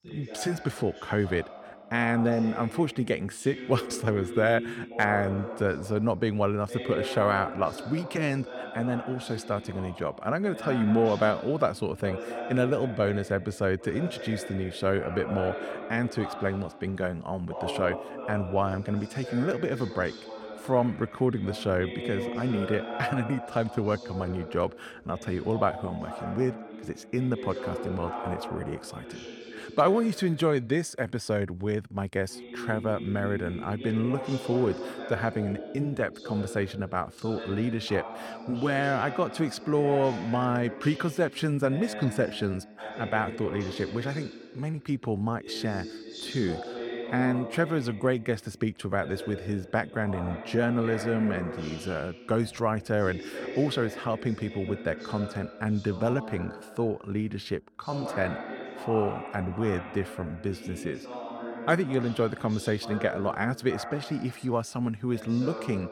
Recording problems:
voice in the background; loud; throughout; 10 dB below the speech

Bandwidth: 17 kHz